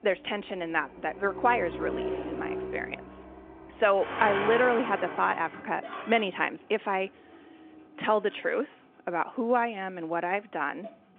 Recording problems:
phone-call audio
traffic noise; loud; throughout; 7 dB below the speech

